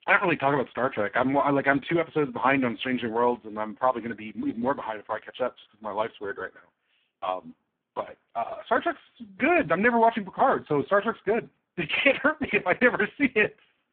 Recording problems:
phone-call audio; poor line

